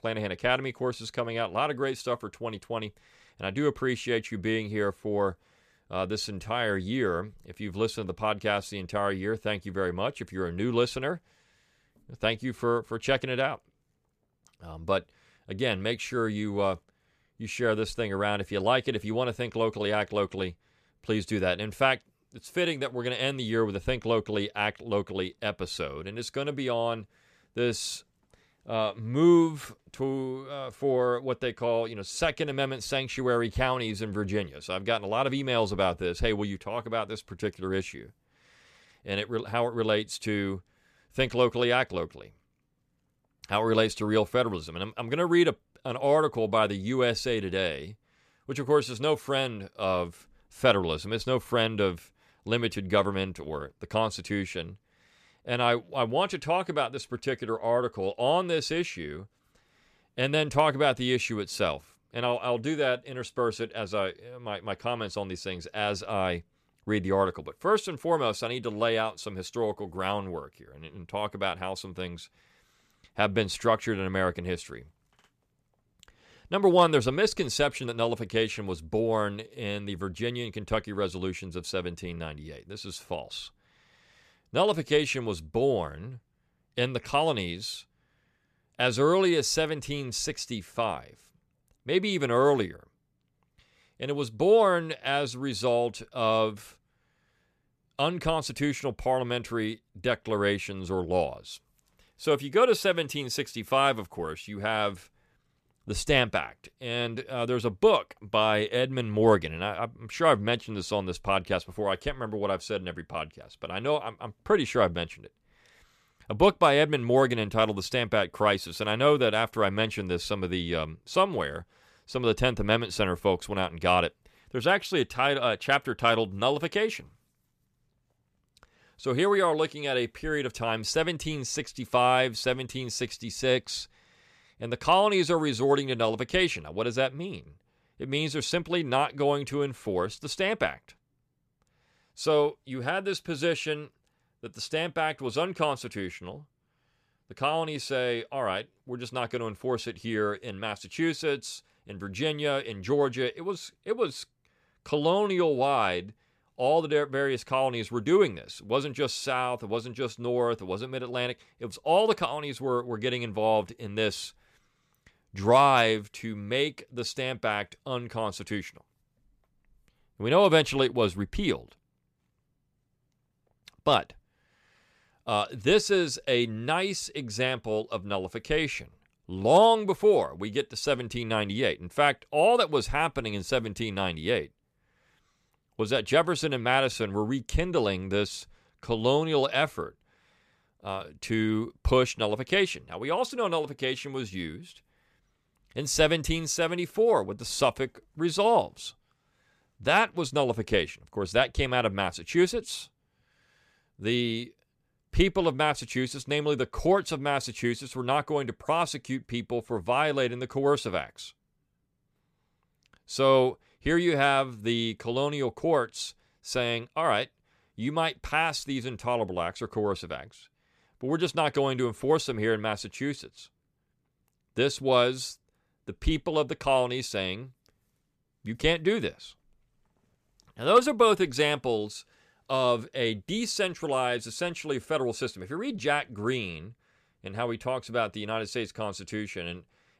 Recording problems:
none

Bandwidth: 14.5 kHz